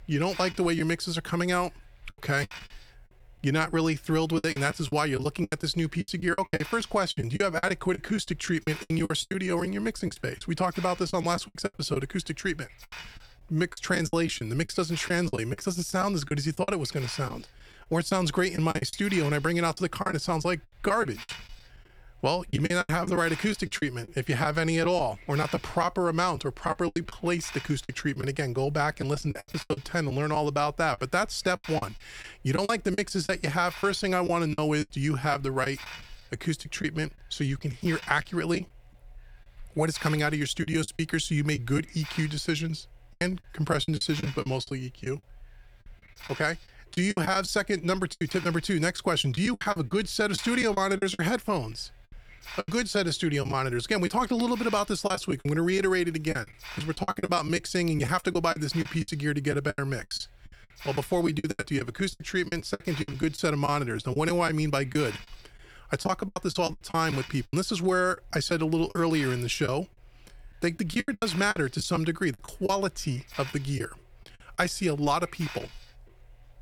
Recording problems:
hiss; noticeable; throughout; 20 dB below the speech
choppy; very; 12% of the speech affected

